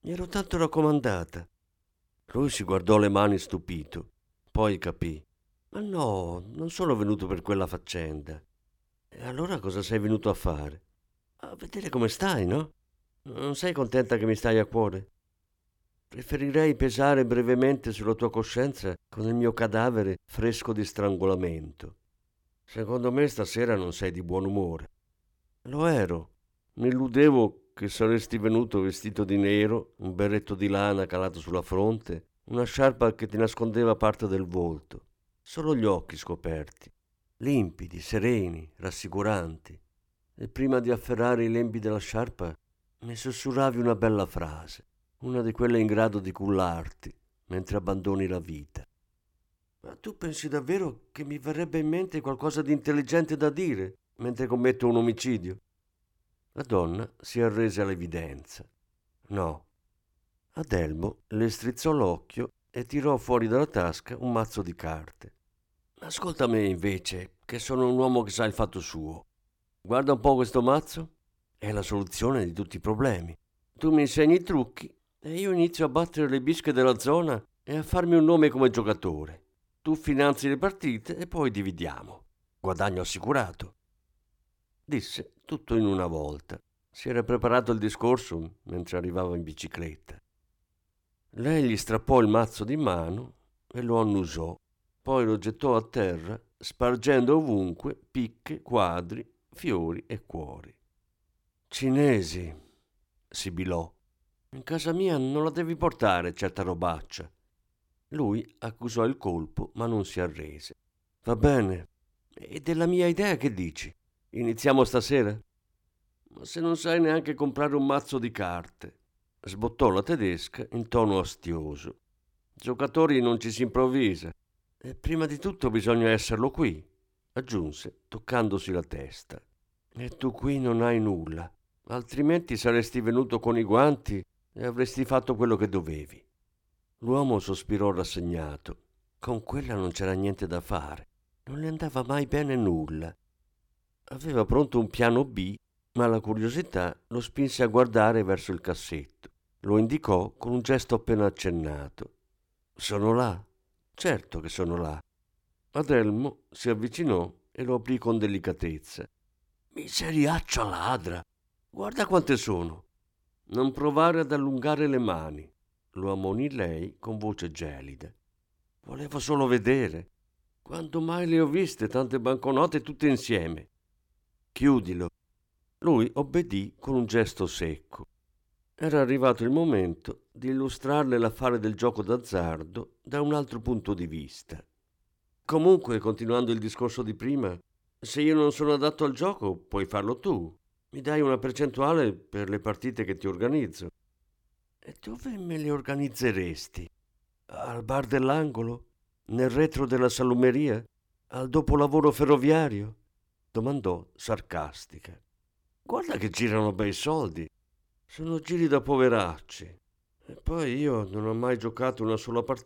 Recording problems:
none

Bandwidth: 18 kHz